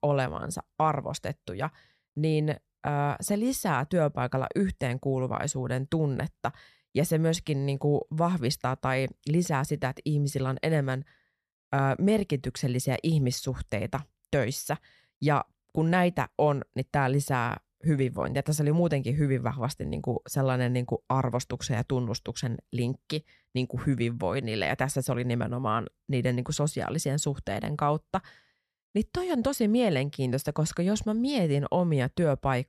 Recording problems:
none

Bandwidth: 14 kHz